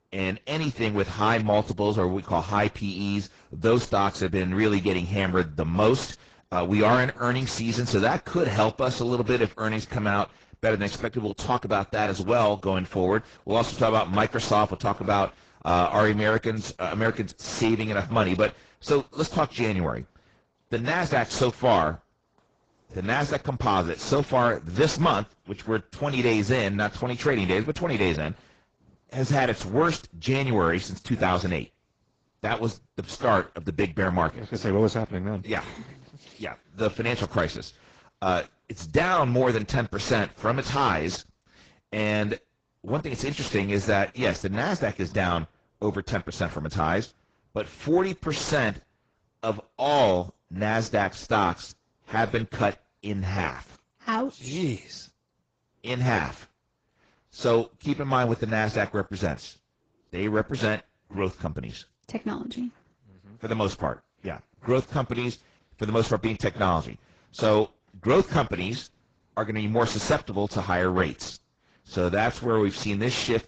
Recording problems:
garbled, watery; badly; nothing above 7.5 kHz
distortion; slight; 10 dB below the speech

